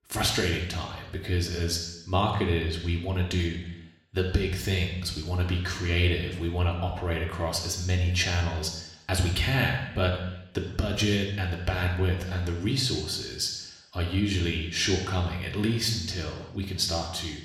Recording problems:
room echo; noticeable; dies away in 0.9 s
off-mic speech; somewhat distant

